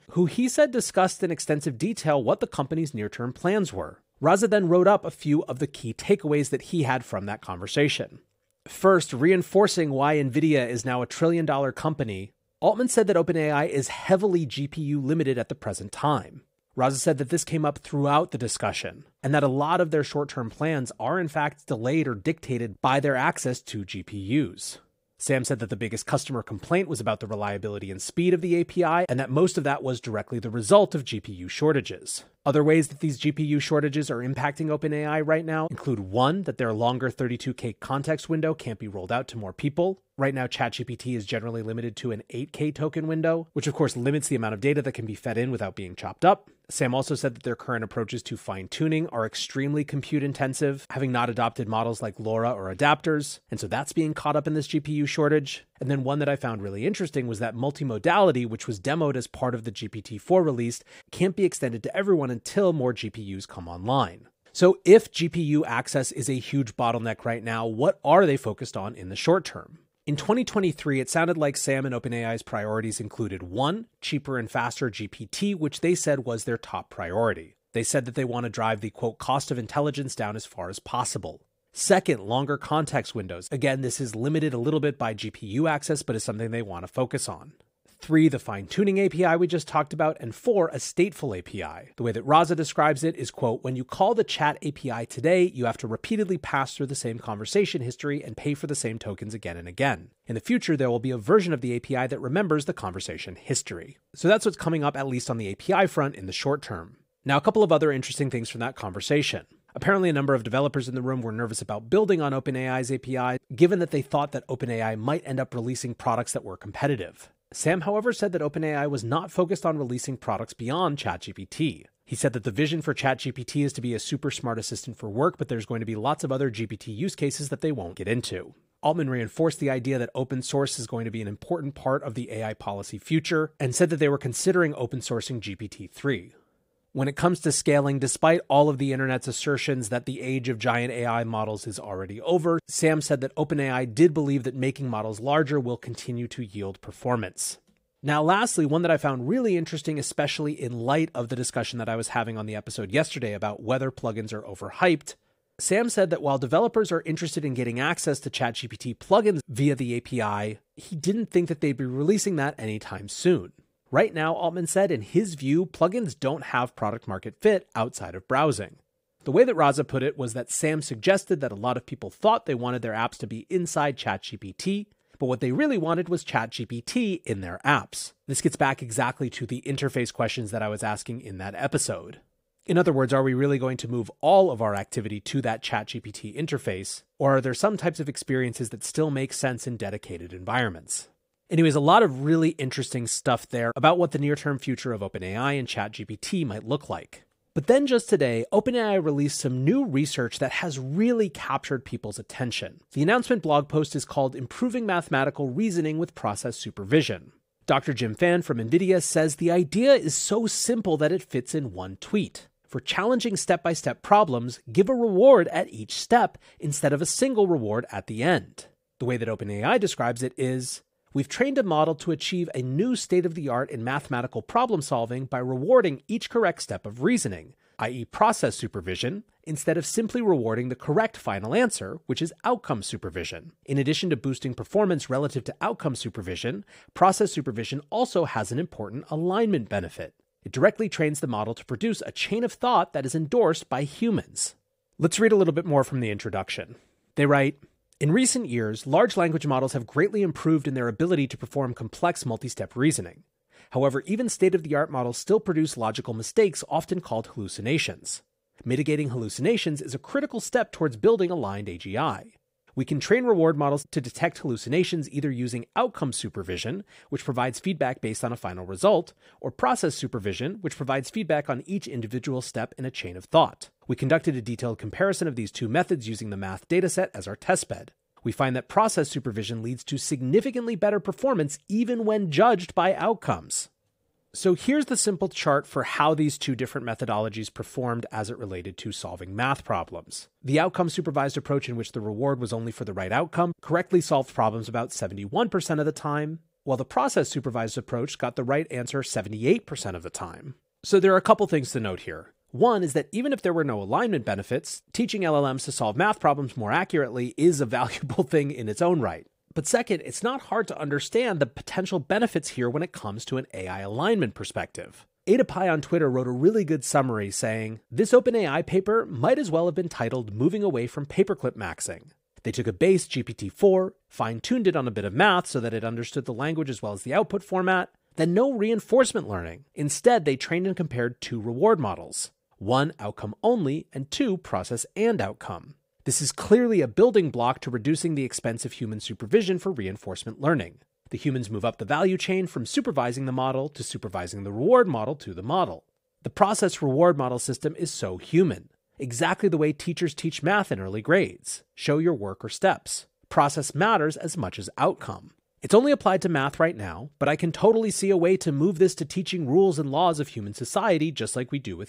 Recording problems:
none

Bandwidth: 15.5 kHz